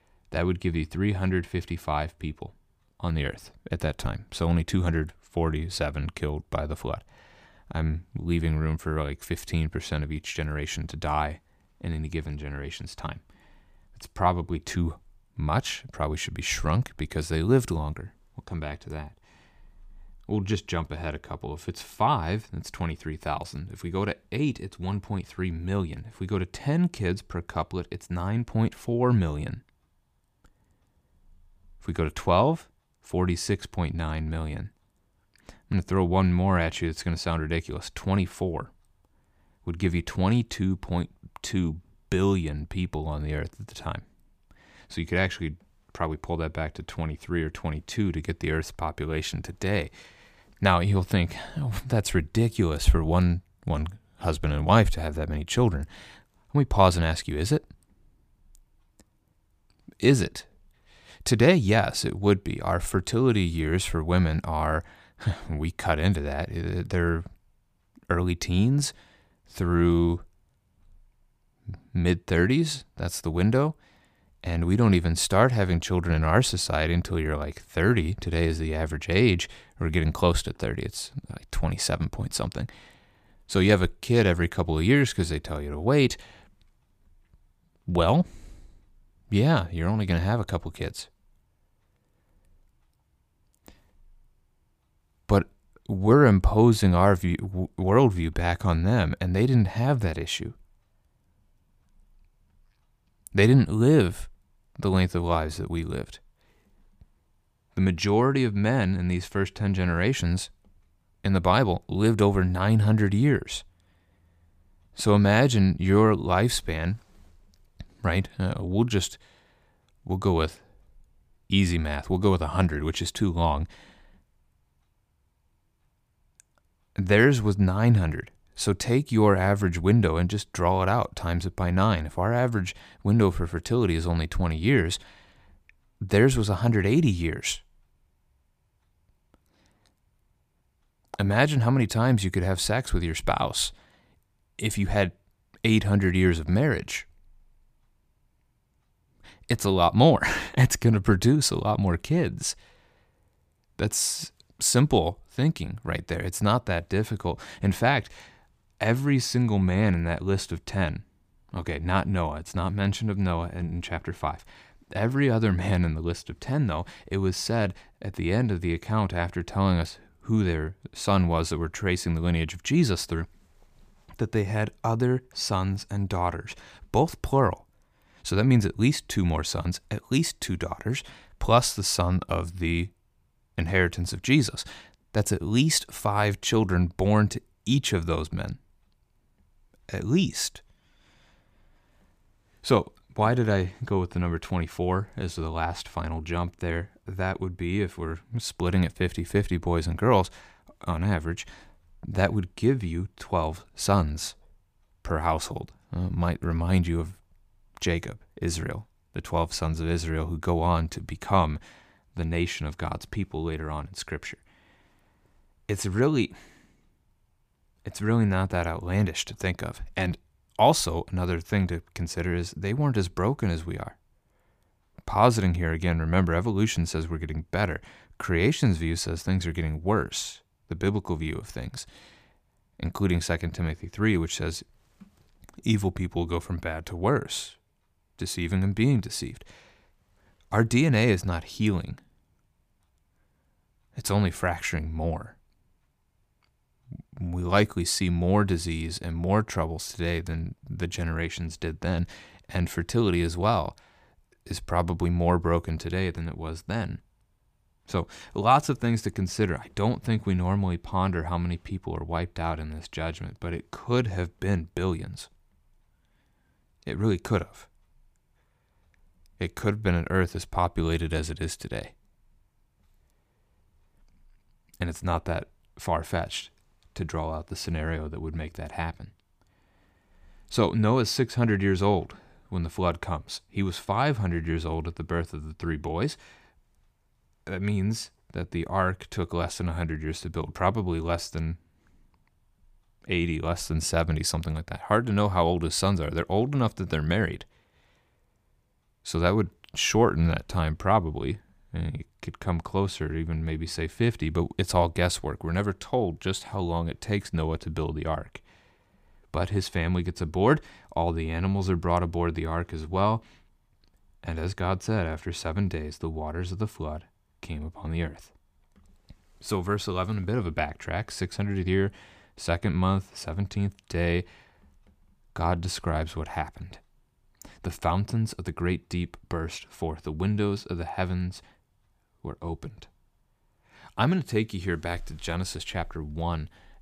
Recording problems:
none

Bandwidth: 15 kHz